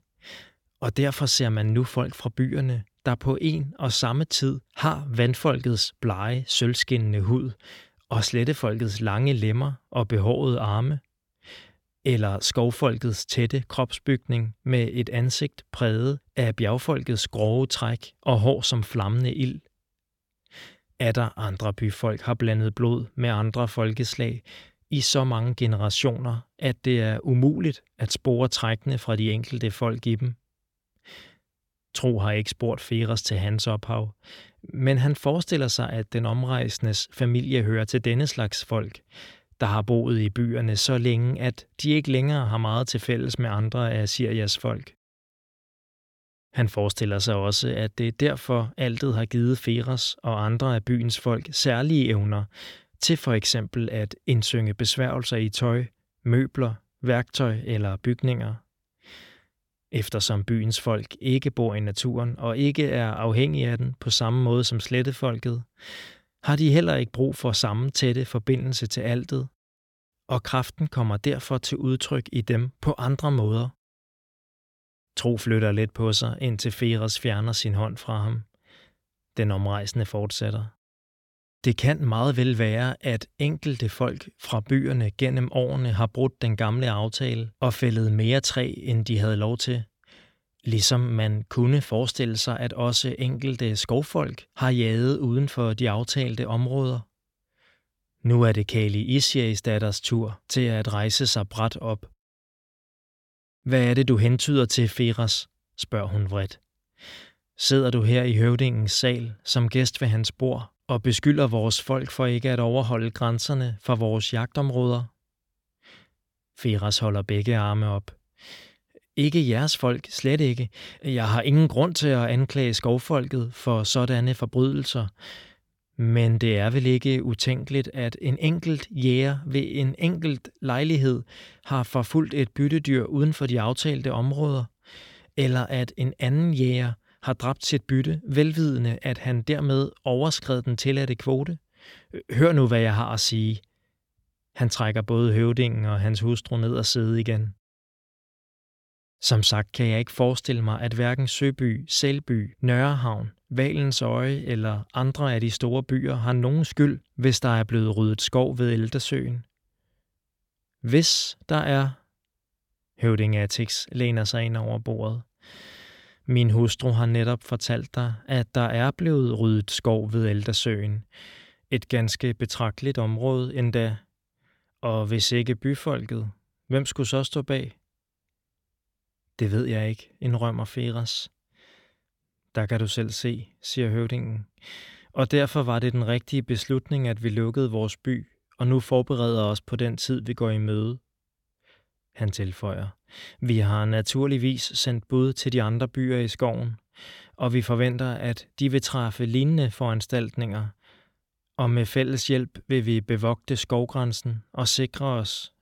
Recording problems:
none

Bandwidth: 17 kHz